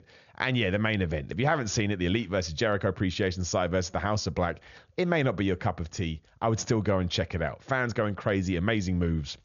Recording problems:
high frequencies cut off; noticeable; nothing above 7 kHz

